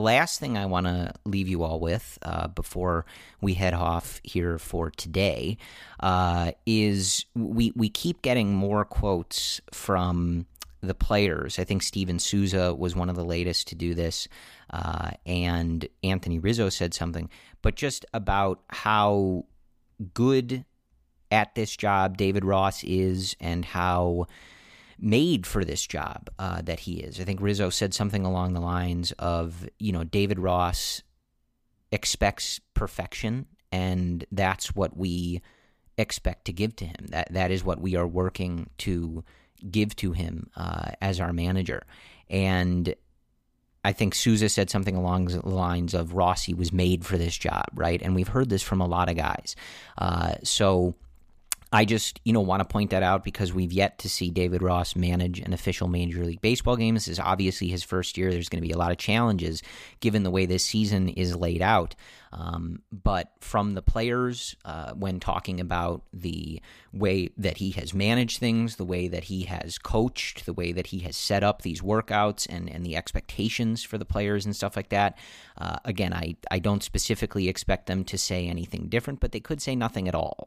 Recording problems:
abrupt cut into speech; at the start

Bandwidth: 15 kHz